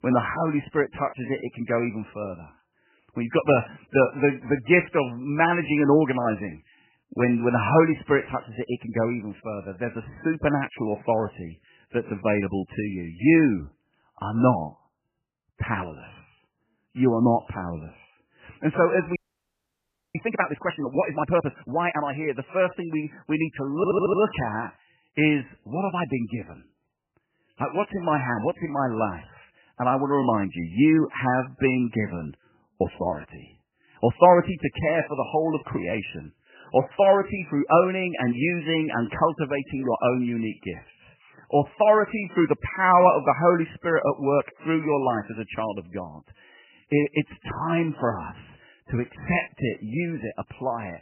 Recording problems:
garbled, watery; badly; nothing above 3 kHz
audio freezing; at 19 s for 1 s
audio stuttering; at 24 s

